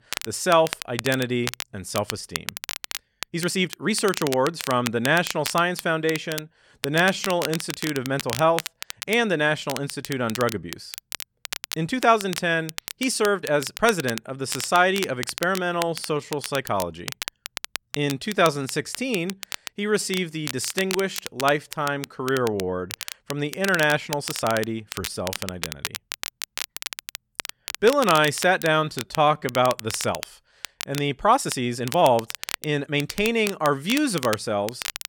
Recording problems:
crackle, like an old record; loud; 10 dB below the speech
uneven, jittery; strongly; from 3 to 33 s

